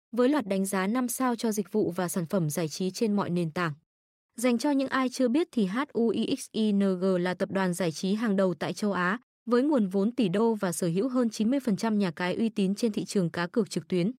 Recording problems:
none

